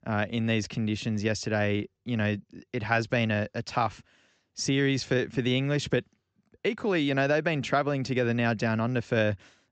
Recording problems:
high frequencies cut off; noticeable; nothing above 8 kHz

